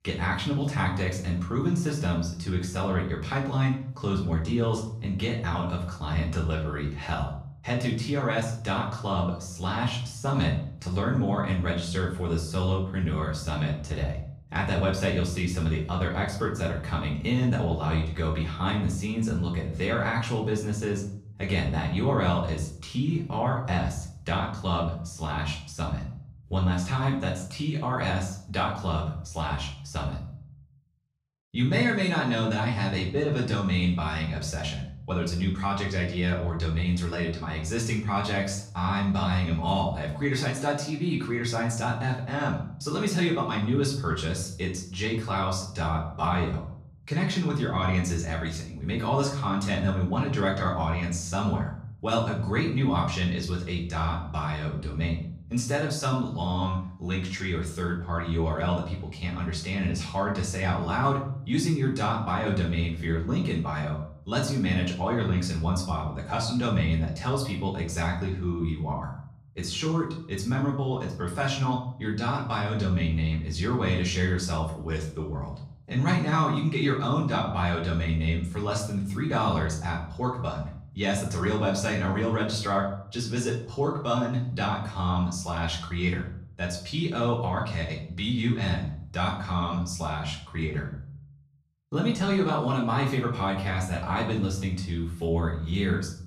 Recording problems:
off-mic speech; far
room echo; slight; dies away in 0.5 s

